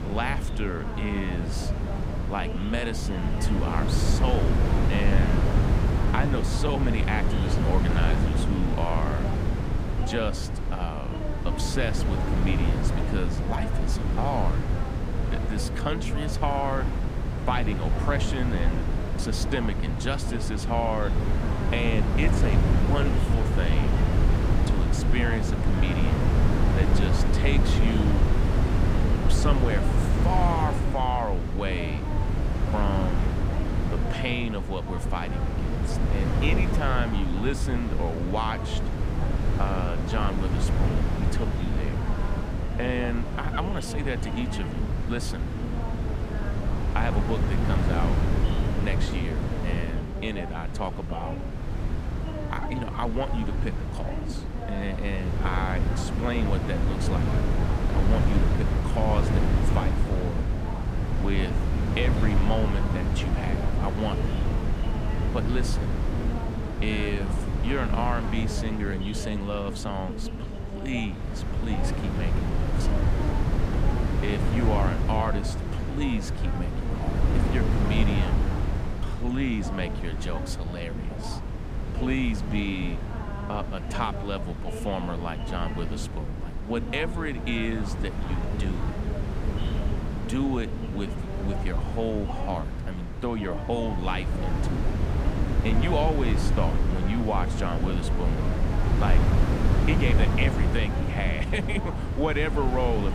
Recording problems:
wind noise on the microphone; heavy; 3 dB below the speech
voice in the background; loud; throughout; 9 dB below the speech

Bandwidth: 15 kHz